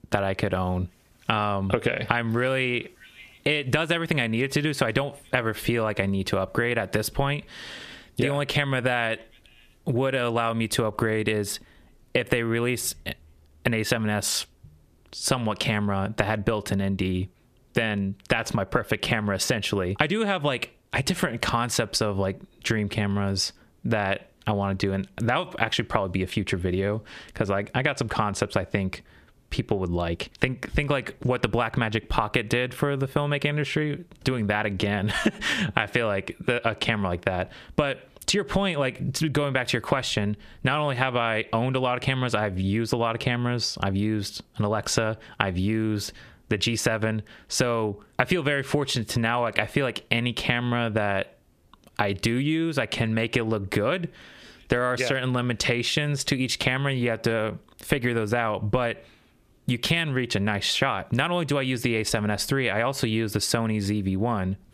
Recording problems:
squashed, flat; heavily

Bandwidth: 14.5 kHz